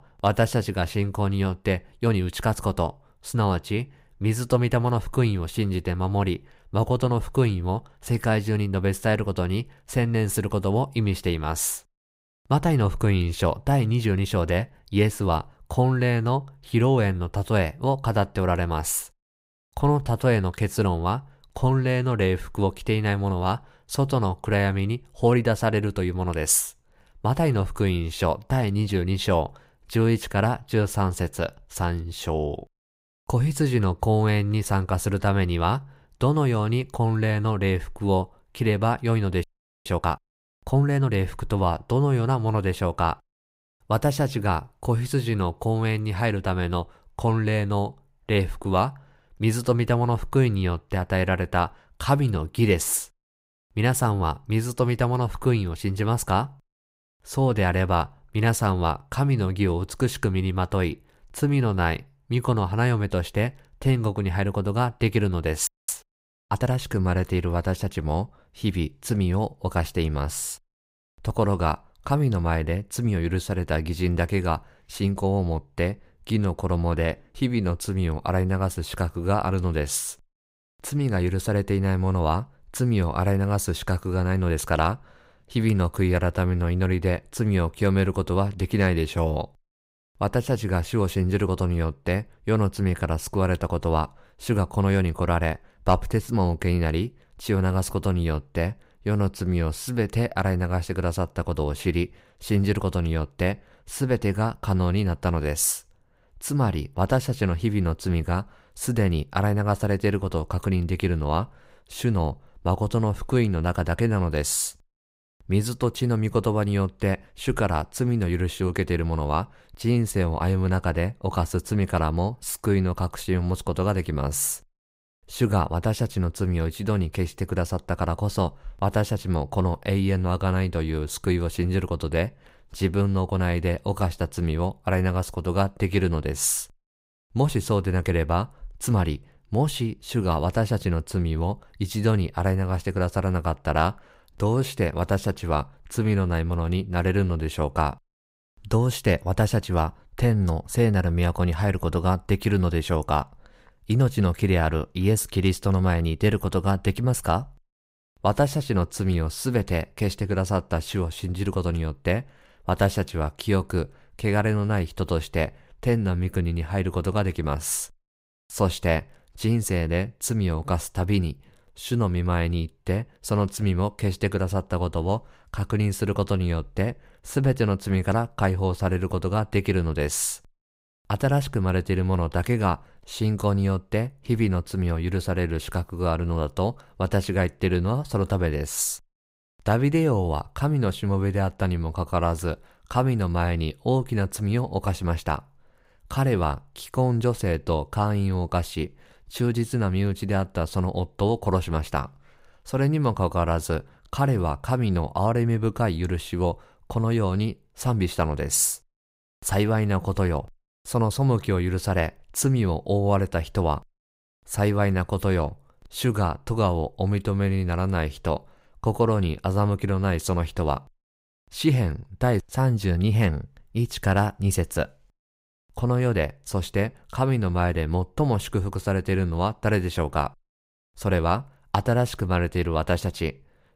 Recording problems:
audio freezing; at 39 s and at 1:06

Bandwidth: 15.5 kHz